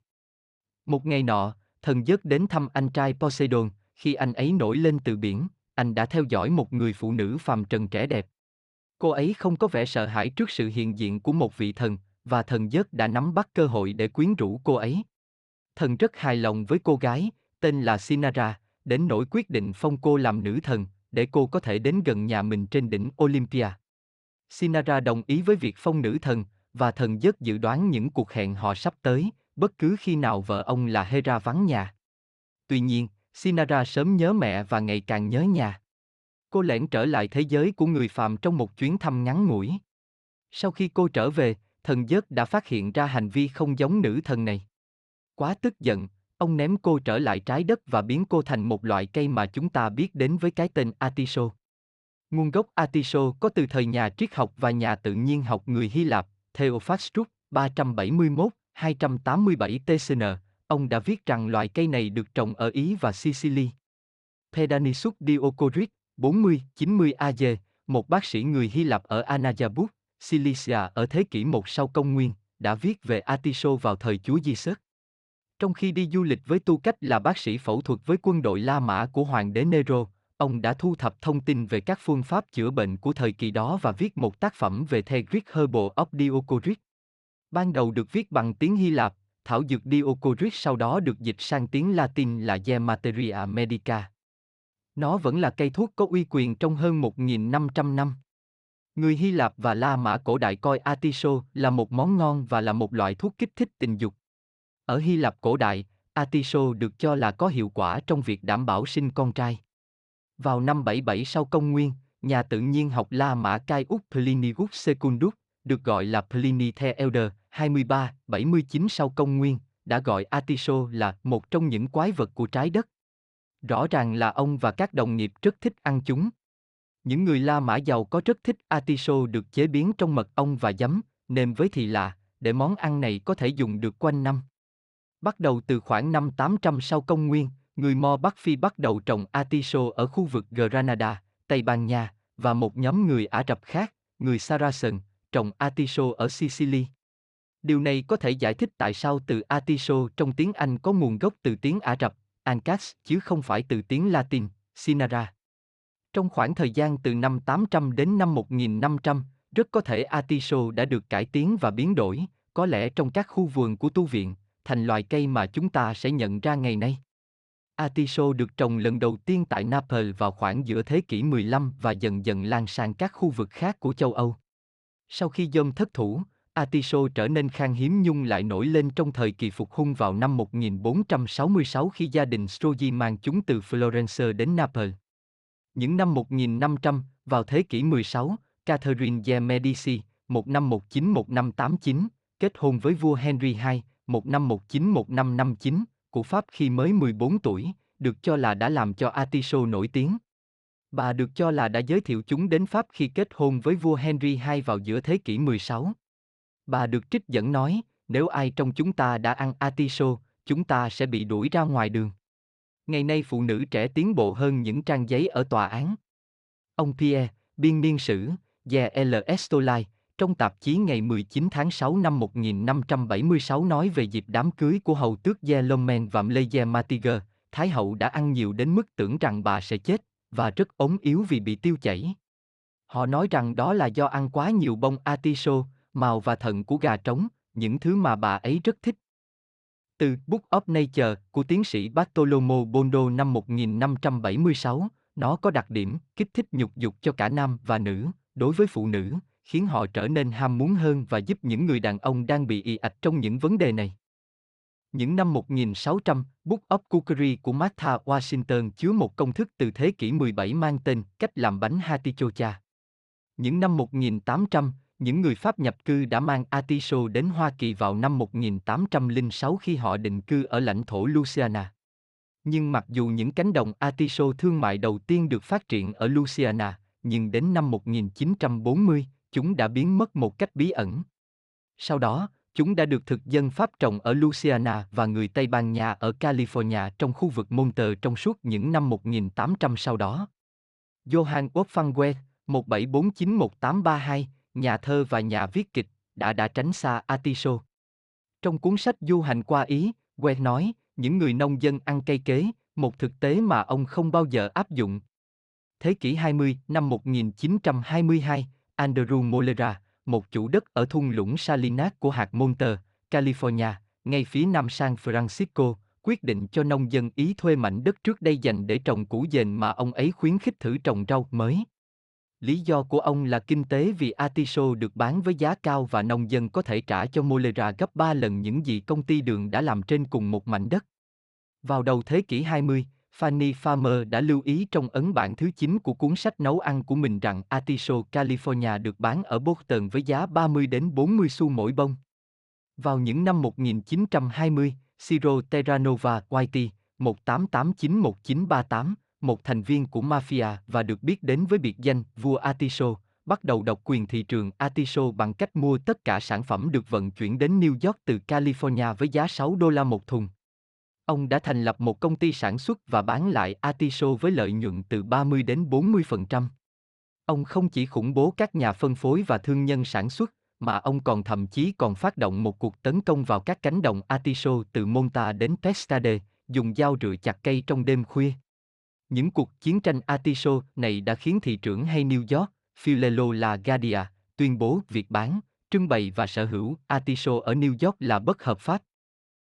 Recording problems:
none

